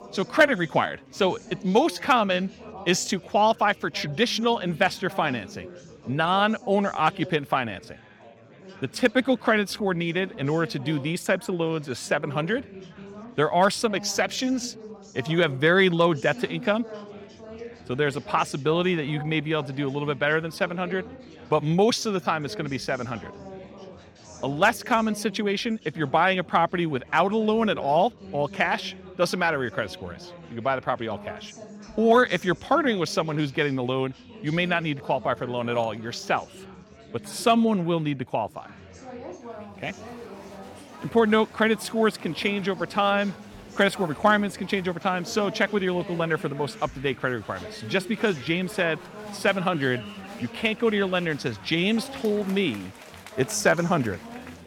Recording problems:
chatter from many people; noticeable; throughout; 20 dB below the speech

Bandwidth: 18 kHz